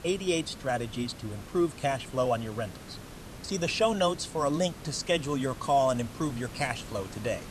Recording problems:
hiss; noticeable; throughout; 15 dB below the speech

